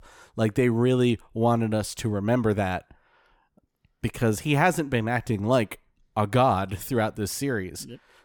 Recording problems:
none

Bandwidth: 18 kHz